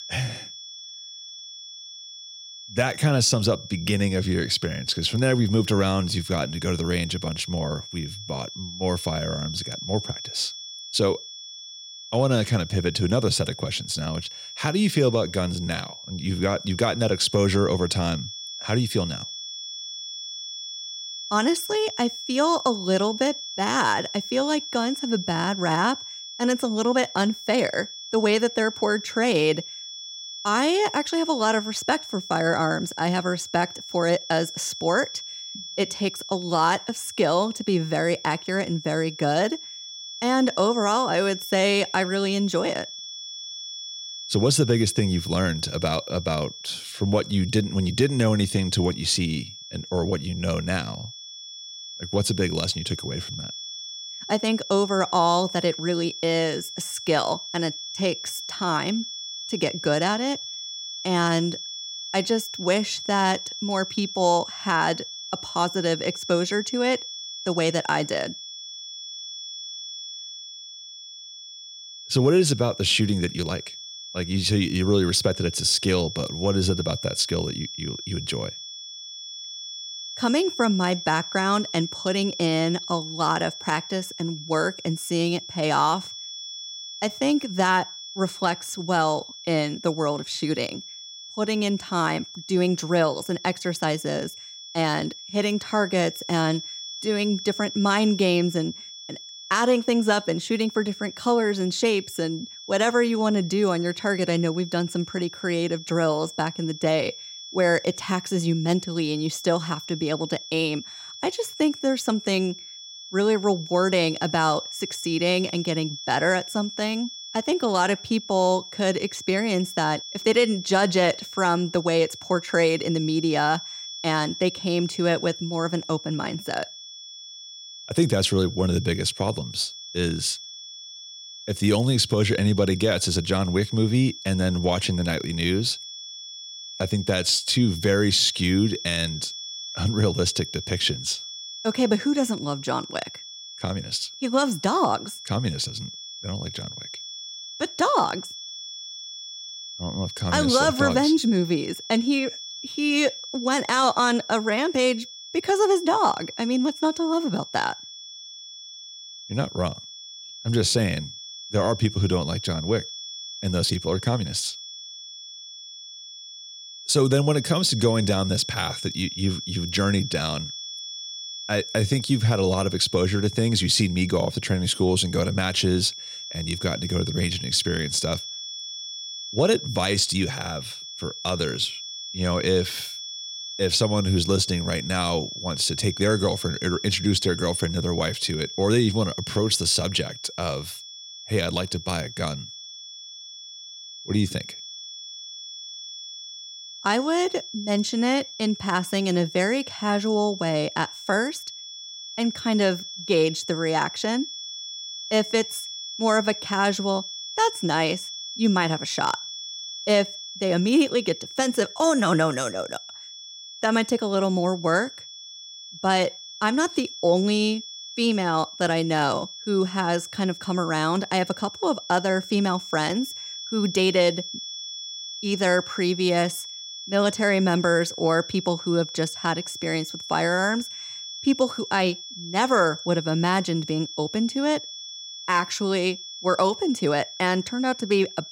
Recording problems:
high-pitched whine; noticeable; throughout; 3.5 kHz, 10 dB below the speech

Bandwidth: 16 kHz